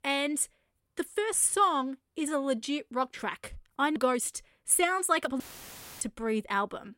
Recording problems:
uneven, jittery; strongly; from 1 to 6.5 s
audio cutting out; filled with static; at 5.5 s for 0.5 s

